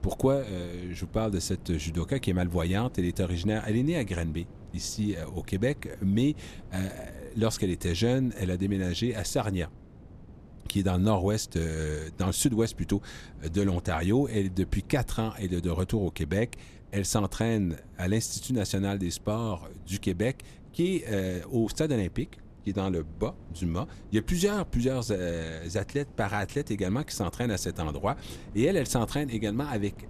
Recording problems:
wind noise on the microphone; occasional gusts; 25 dB below the speech

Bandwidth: 14 kHz